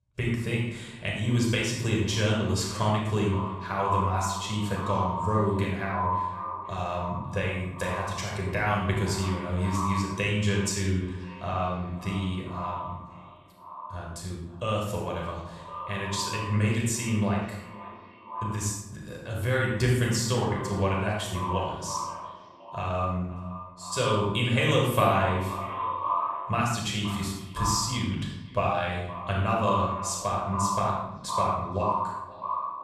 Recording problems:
echo of what is said; strong; throughout; 520 ms later, 7 dB below the speech
off-mic speech; far
room echo; noticeable; dies away in 0.7 s

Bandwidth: 13.5 kHz